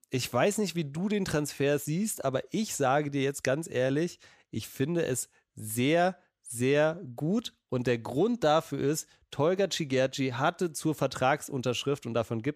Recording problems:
none

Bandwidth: 14.5 kHz